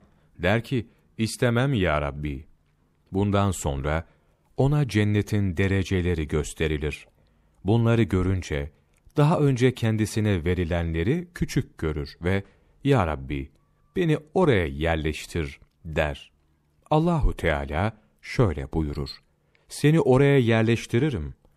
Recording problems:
none

